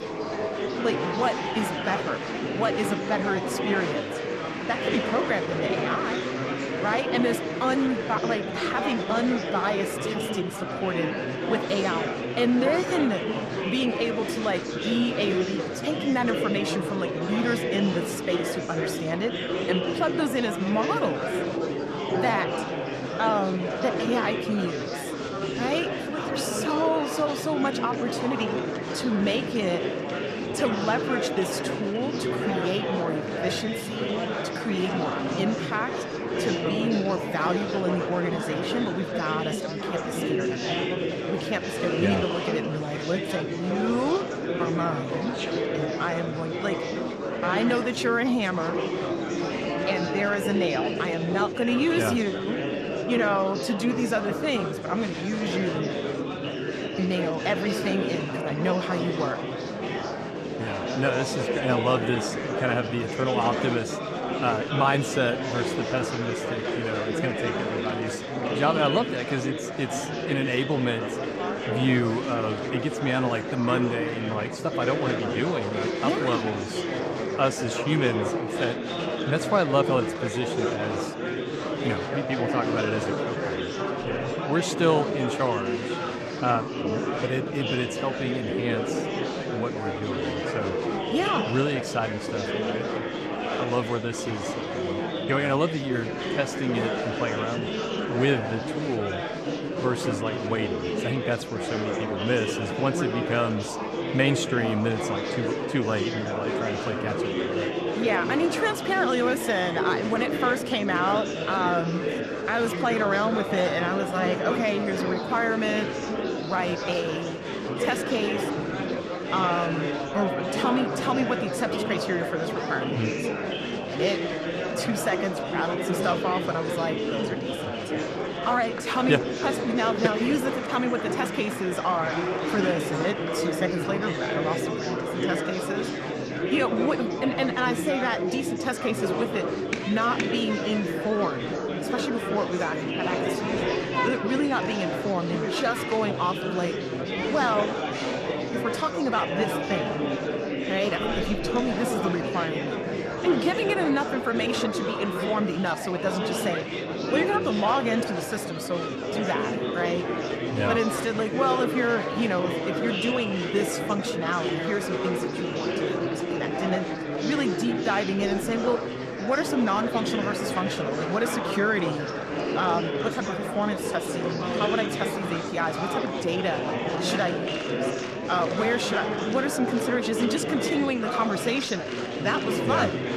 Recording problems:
murmuring crowd; loud; throughout; 1 dB below the speech

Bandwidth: 14 kHz